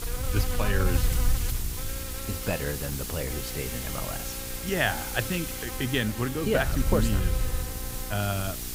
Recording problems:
electrical hum; loud; throughout; 60 Hz, 8 dB below the speech
hiss; loud; throughout; 5 dB below the speech
wind noise on the microphone; occasional gusts; 20 dB below the speech

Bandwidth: 15.5 kHz